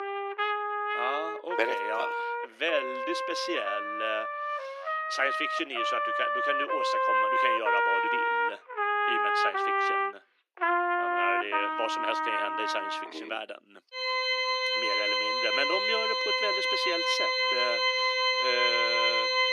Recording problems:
thin; very; fading below 300 Hz
background music; very loud; throughout; 6 dB above the speech

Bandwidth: 14.5 kHz